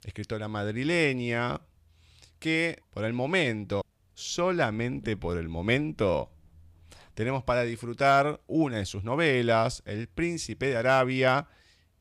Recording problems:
none

